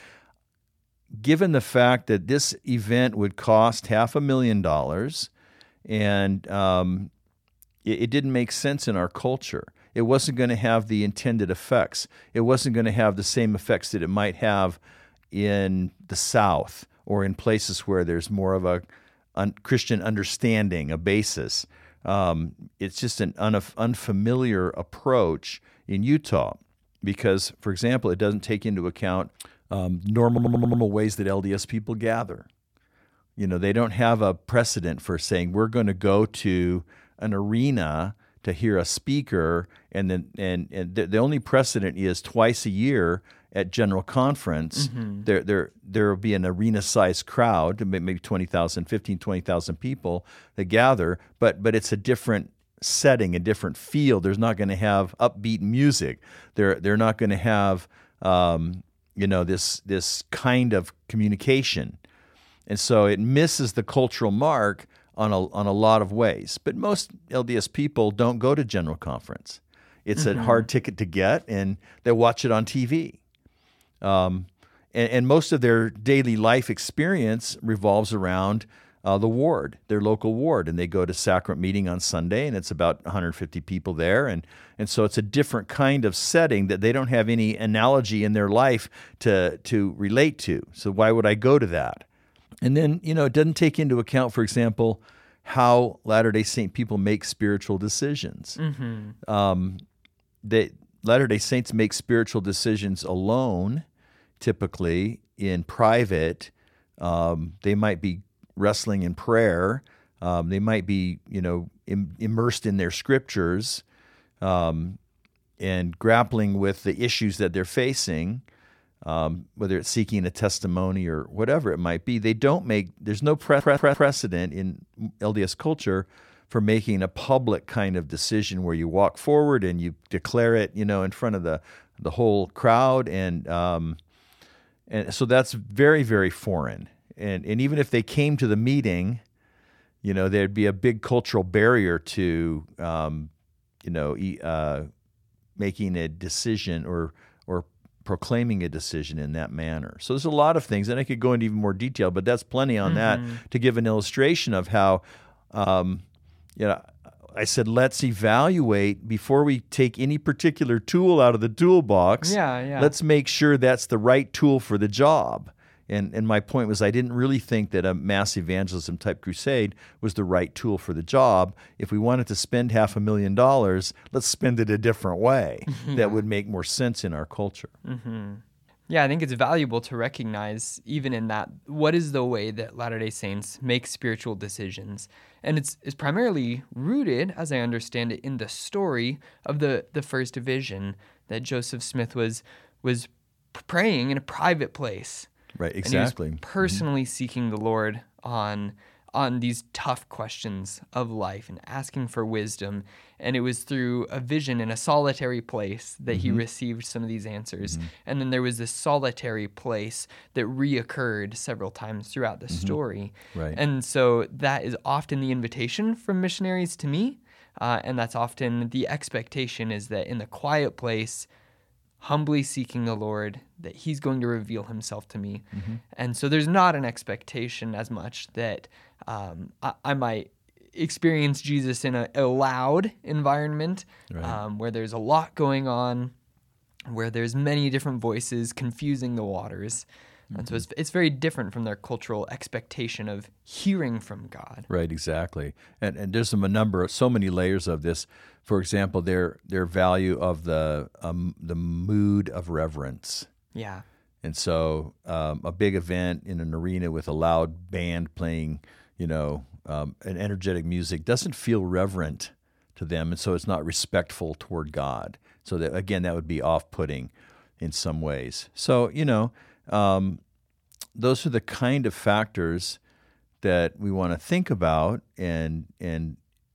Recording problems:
audio stuttering; at 30 s and at 2:03

